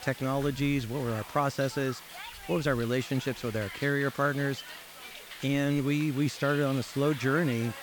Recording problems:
hiss; noticeable; throughout; 15 dB below the speech

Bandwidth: 18.5 kHz